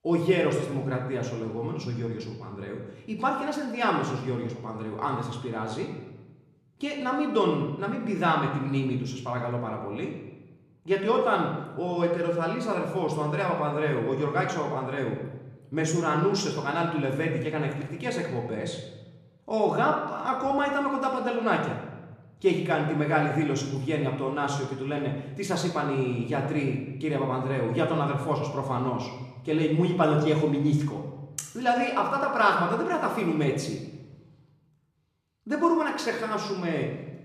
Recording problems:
room echo; noticeable; dies away in 0.9 s
off-mic speech; somewhat distant

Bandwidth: 14.5 kHz